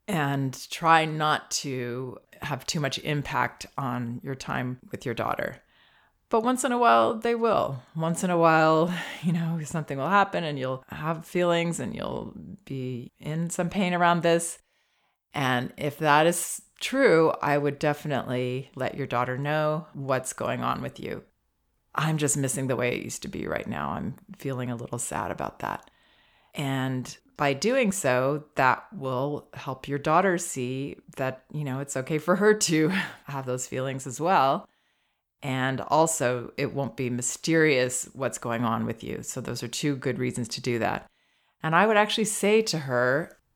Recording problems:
none

